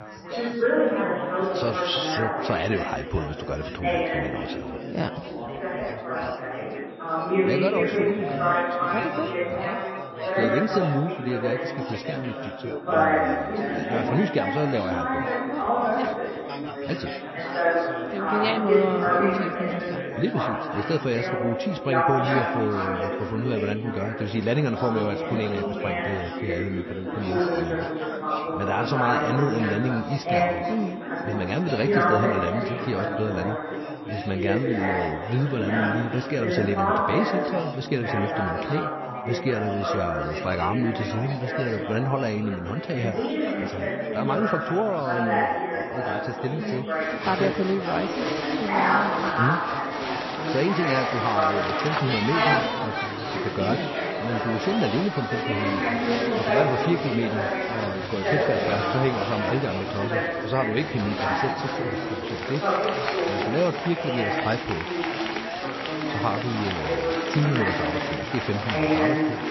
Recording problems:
garbled, watery; slightly; nothing above 5.5 kHz
chatter from many people; very loud; throughout; 2 dB above the speech
high-pitched whine; faint; from 7 to 19 s, from 26 to 38 s and from 49 s to 1:01; 3.5 kHz, 30 dB below the speech

